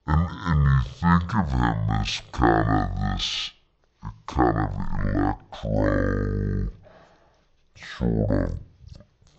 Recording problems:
wrong speed and pitch; too slow and too low; 0.5 times normal speed

